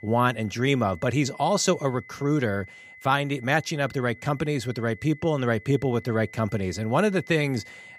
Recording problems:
high-pitched whine; faint; throughout; 2 kHz, 20 dB below the speech

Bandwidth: 15.5 kHz